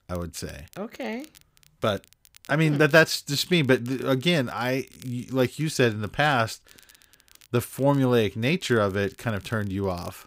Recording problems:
crackle, like an old record; faint; 30 dB below the speech

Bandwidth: 15.5 kHz